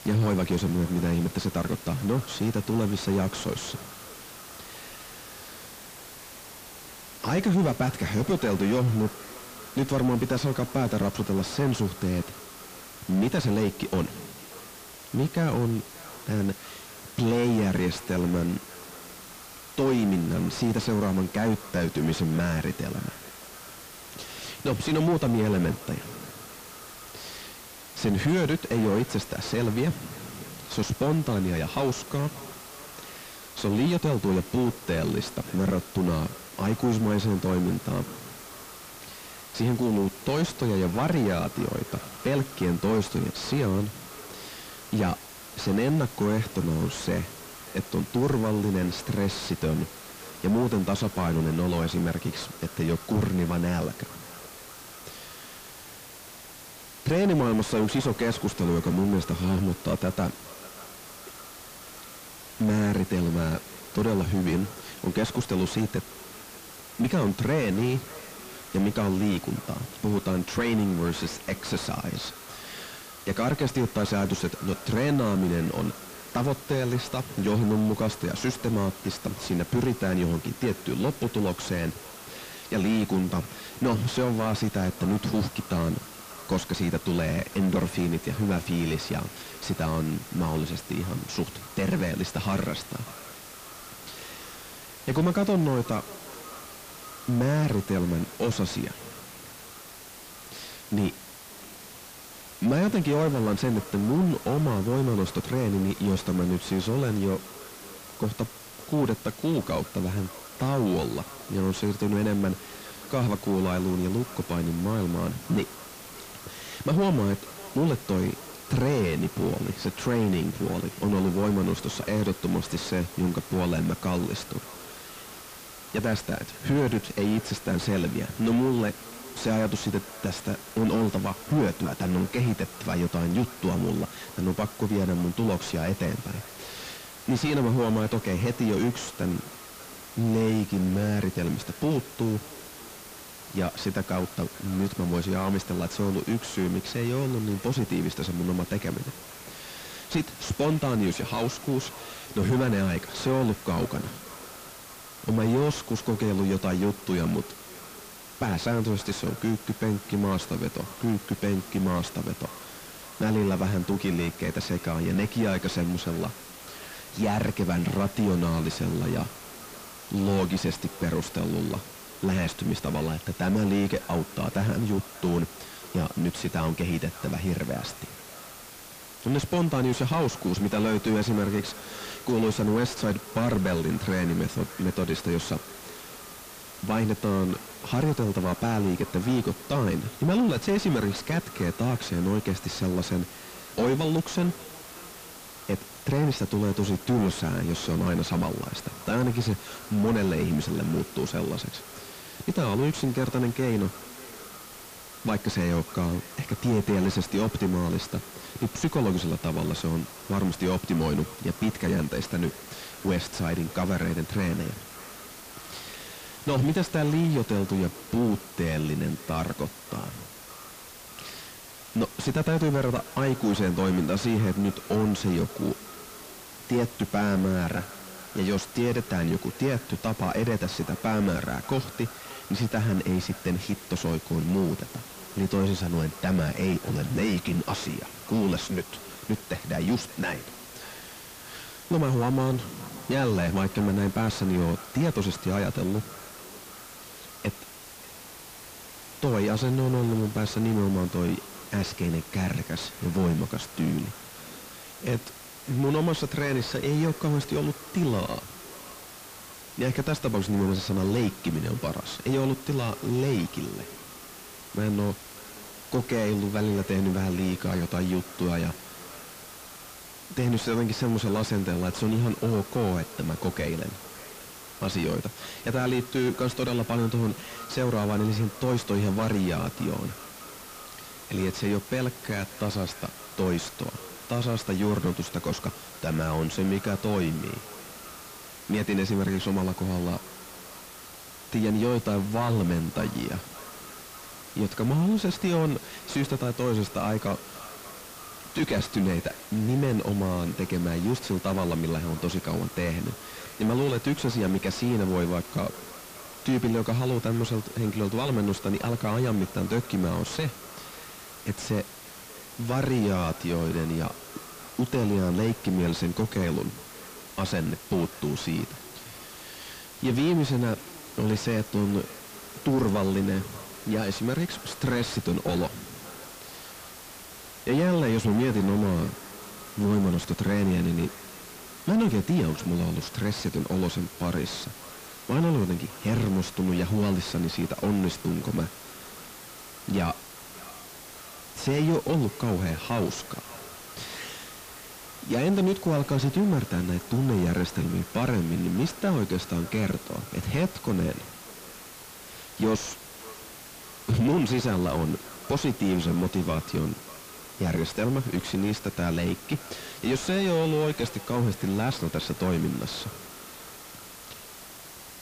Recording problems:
distortion; heavy; 7 dB below the speech
echo of what is said; faint; throughout; 590 ms later, 20 dB below the speech
hiss; noticeable; throughout; 15 dB below the speech
crackling; faint; at 42 s and from 3:36 to 3:37; 20 dB below the speech

